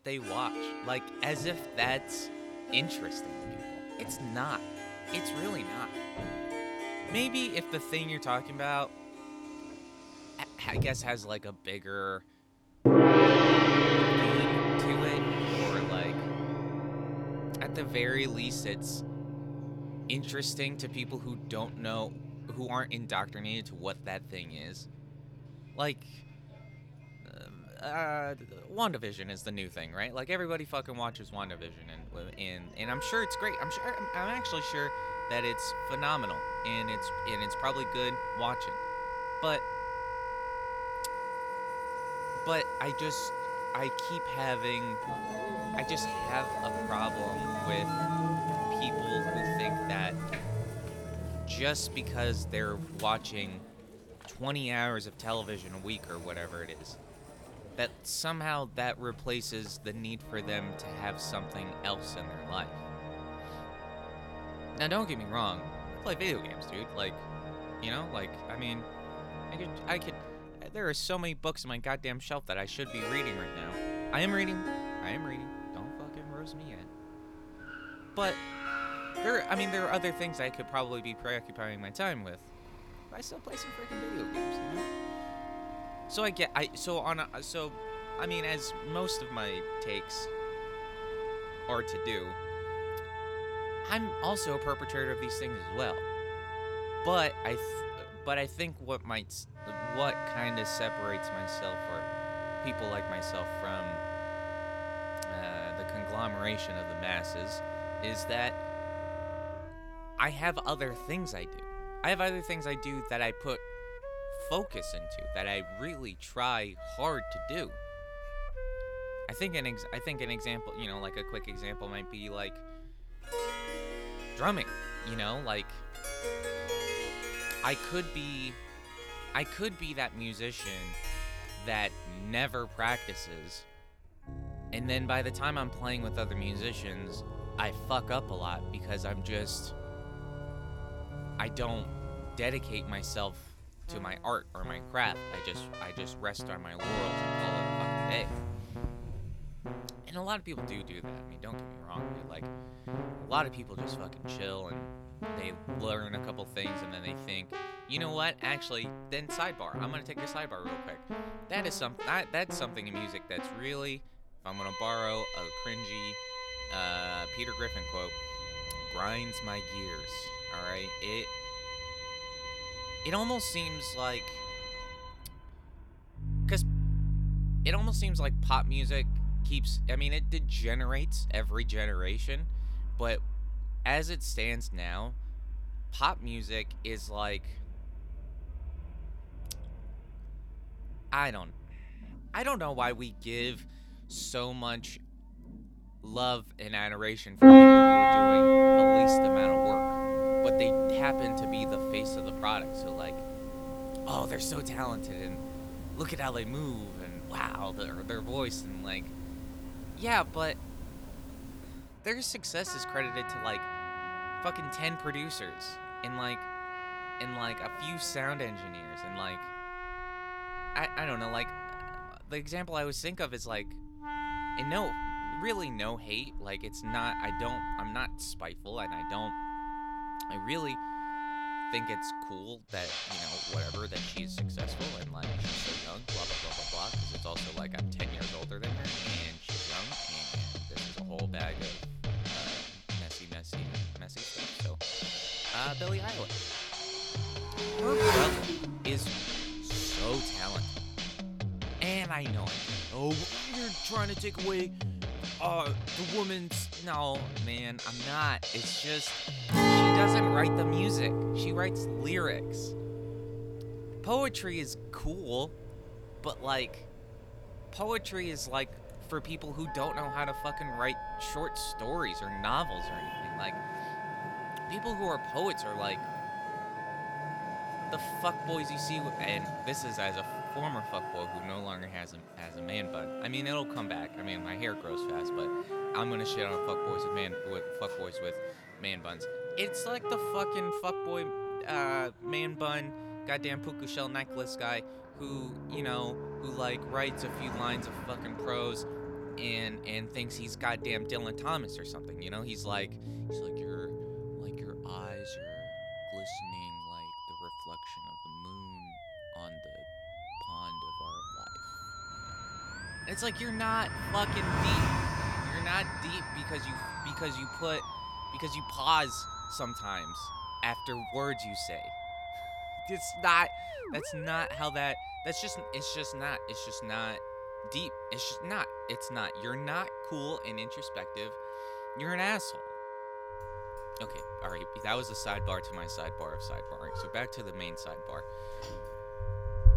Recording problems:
background music; very loud; throughout; 2 dB above the speech
traffic noise; noticeable; throughout; 10 dB below the speech

